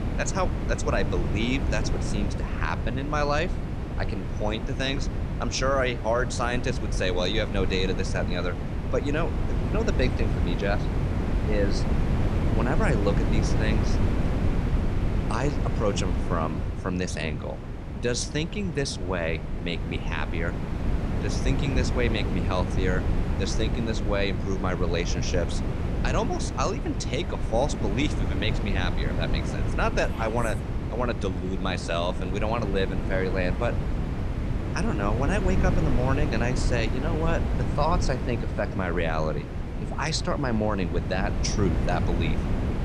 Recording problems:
wind noise on the microphone; heavy; 7 dB below the speech

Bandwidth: 13 kHz